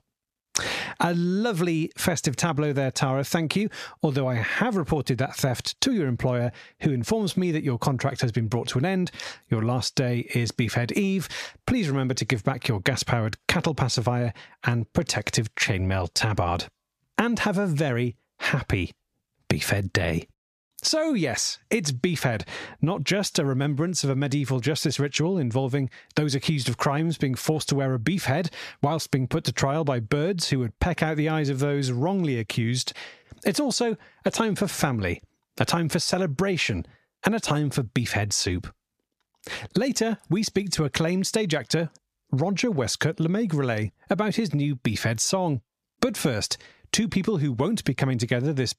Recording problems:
squashed, flat; somewhat

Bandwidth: 14.5 kHz